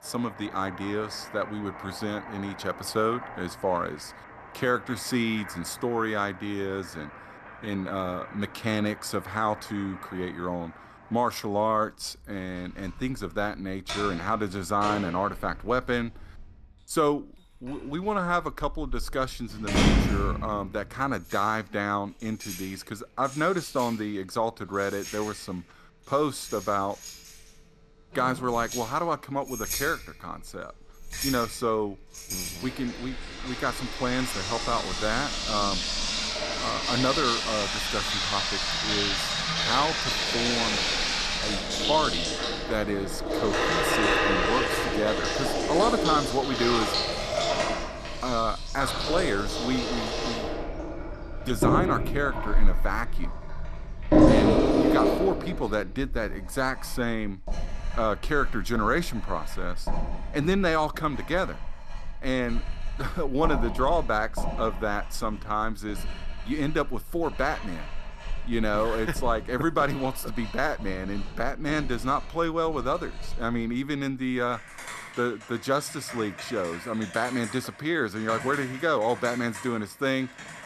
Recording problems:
household noises; very loud; throughout; as loud as the speech

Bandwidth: 13.5 kHz